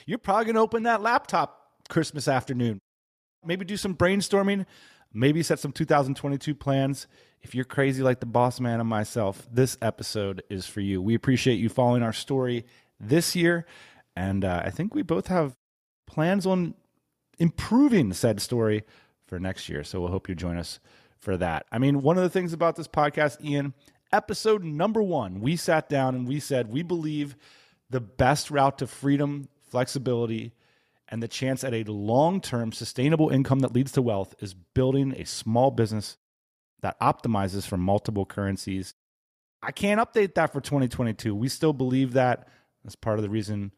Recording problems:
none

